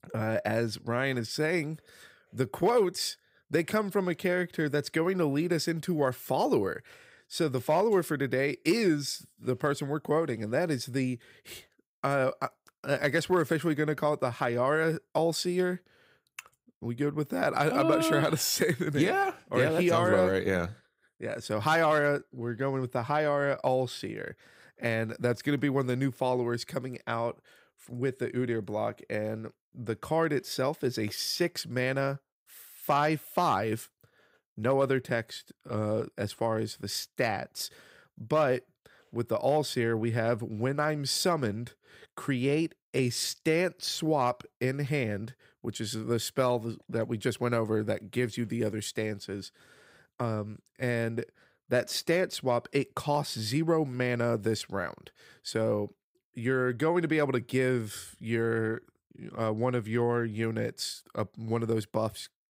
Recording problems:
none

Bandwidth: 15.5 kHz